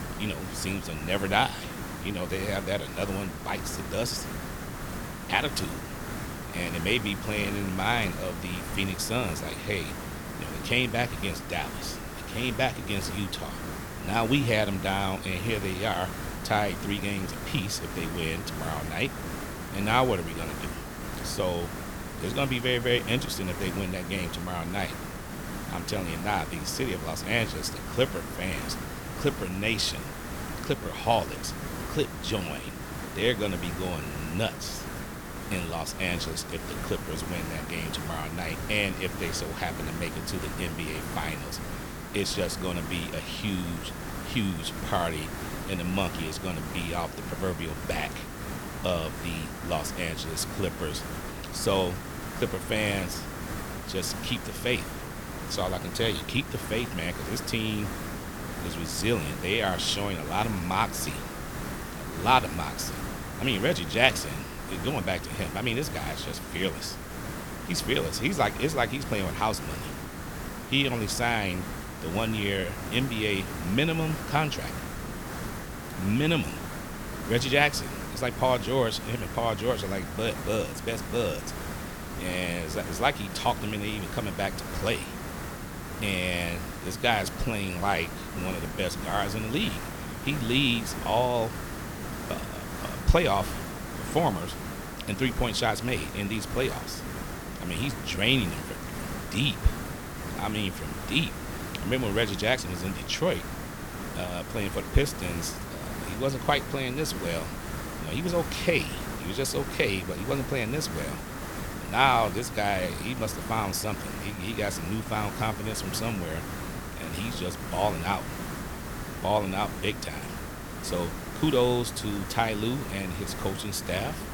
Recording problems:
hiss; loud; throughout; 7 dB below the speech

